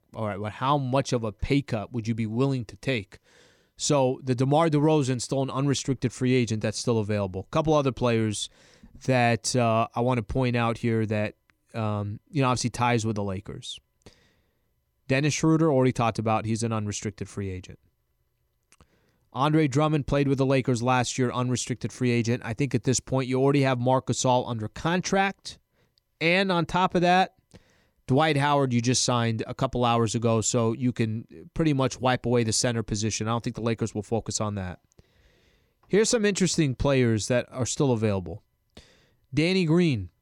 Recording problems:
none

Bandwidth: 17 kHz